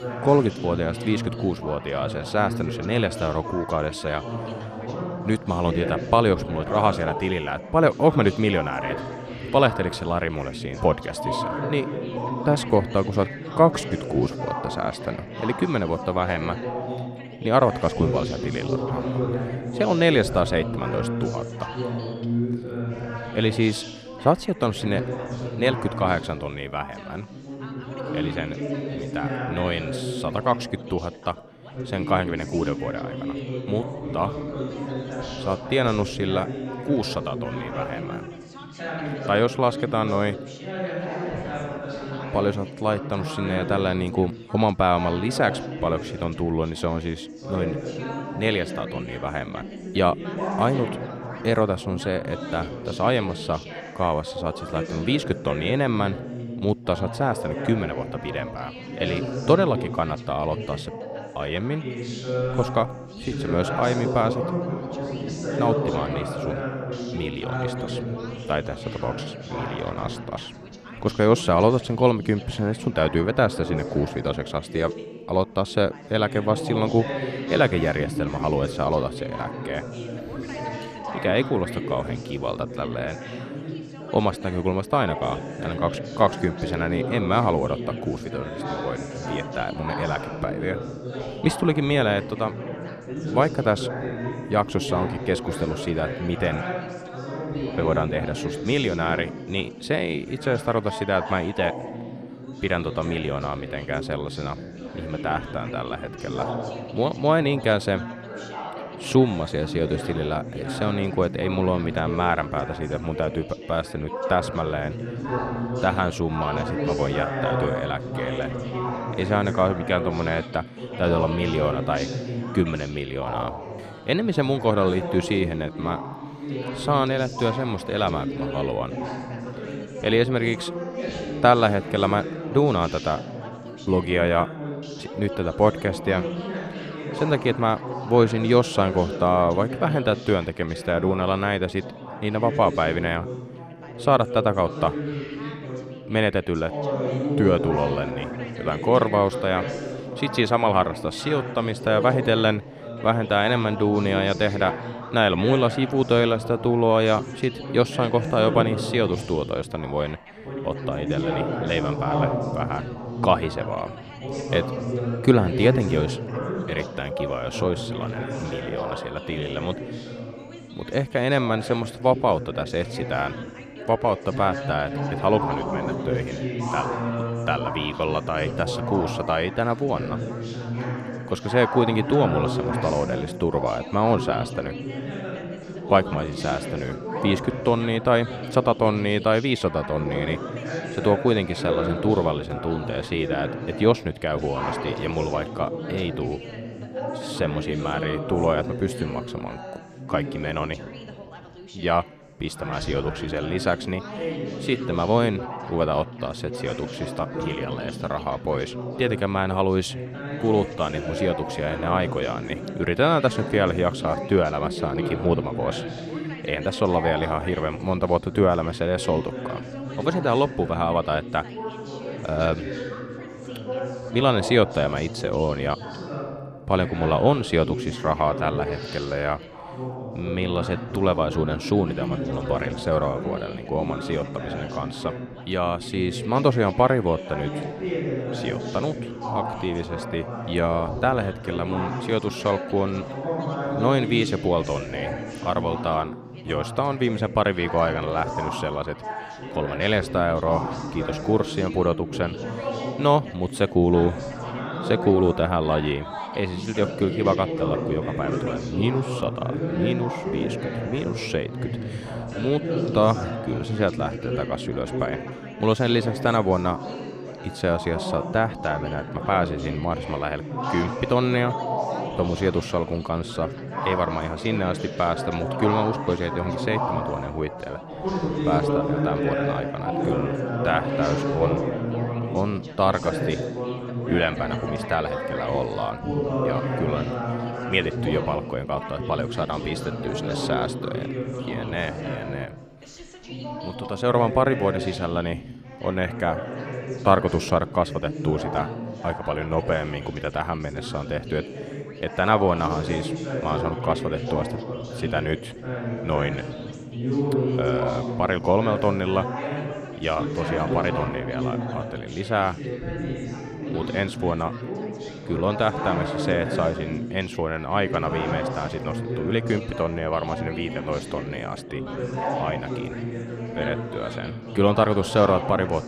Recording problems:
background chatter; loud; throughout; 3 voices, 6 dB below the speech

